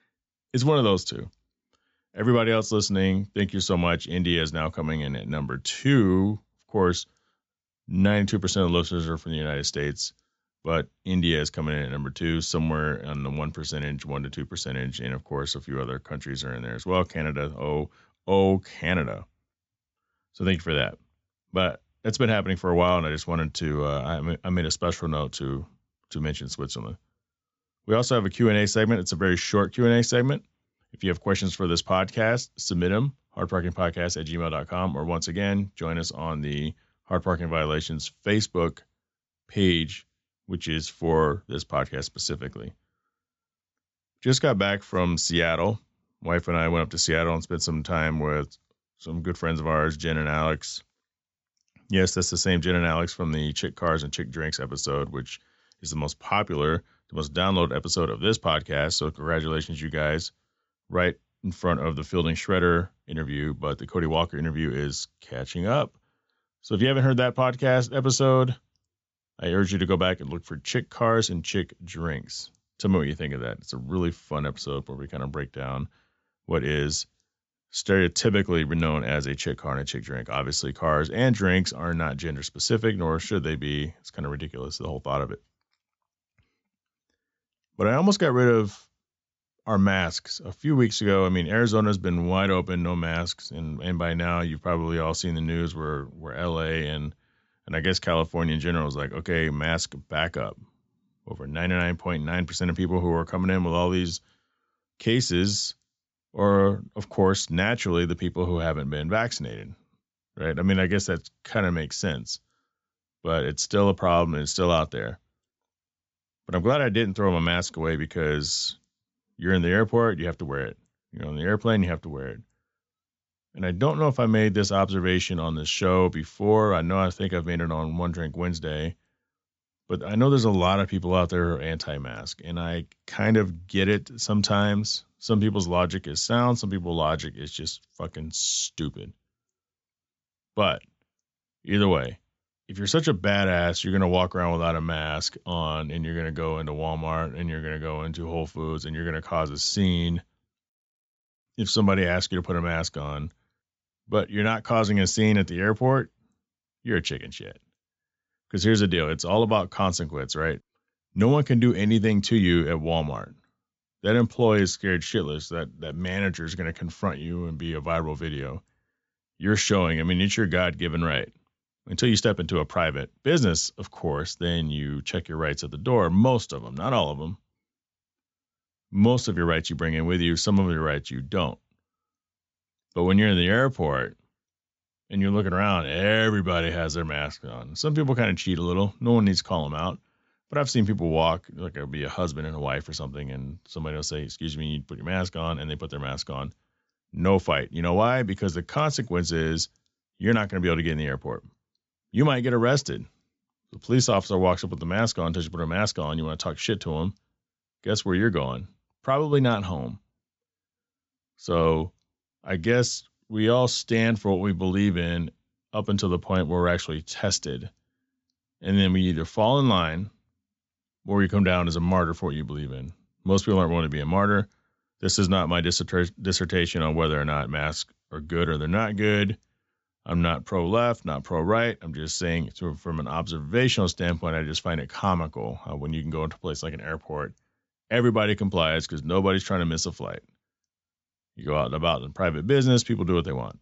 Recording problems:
high frequencies cut off; noticeable; nothing above 7.5 kHz

